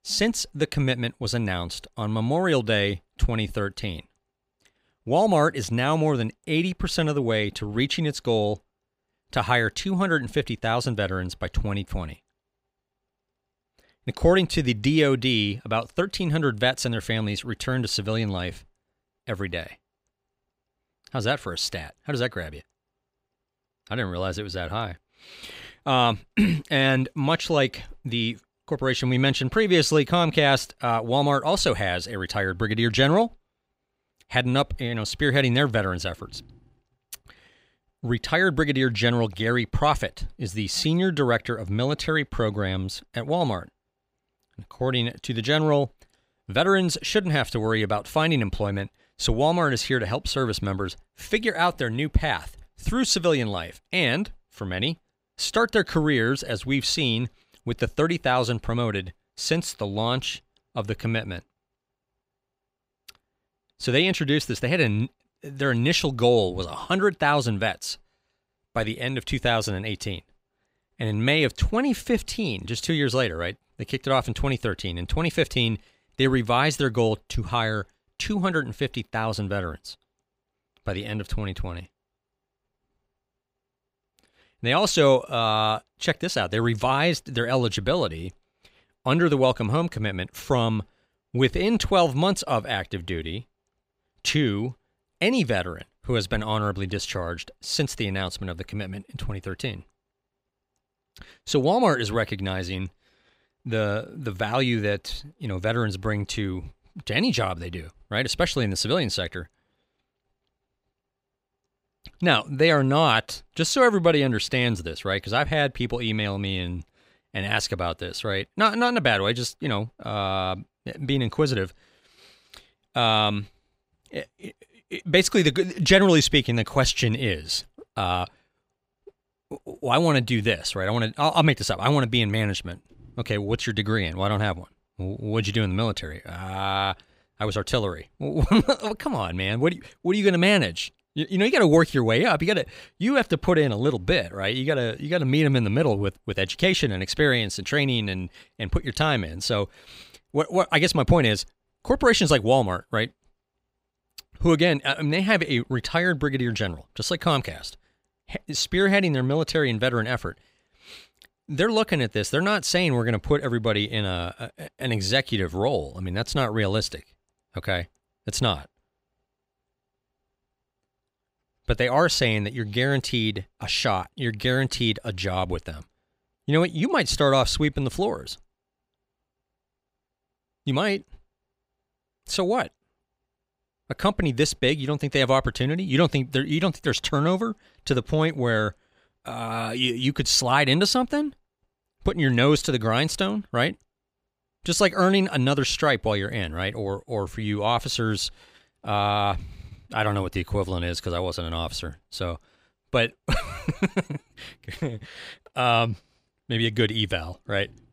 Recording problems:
none

